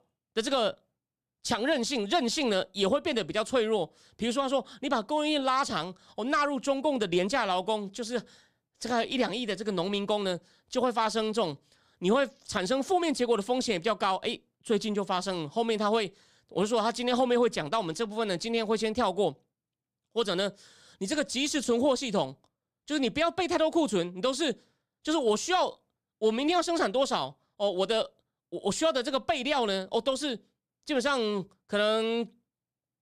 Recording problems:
none

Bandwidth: 15 kHz